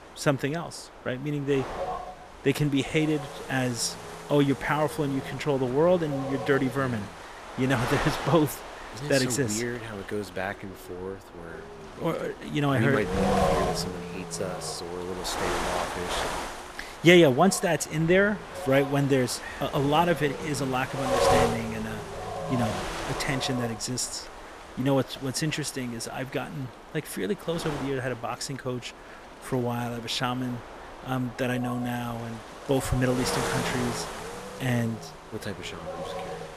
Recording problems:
wind noise on the microphone; heavy; 5 dB below the speech

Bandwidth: 14.5 kHz